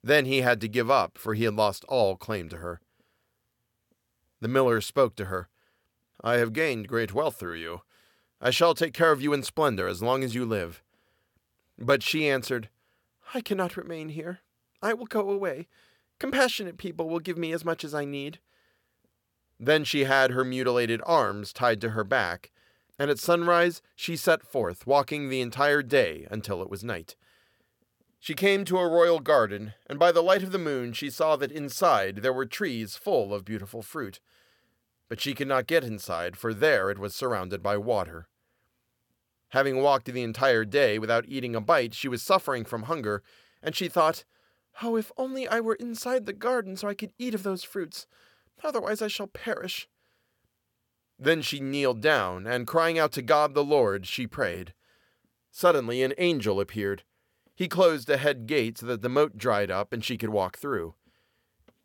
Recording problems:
none

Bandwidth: 17.5 kHz